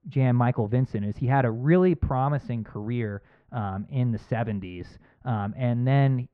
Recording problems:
muffled; very; fading above 1.5 kHz

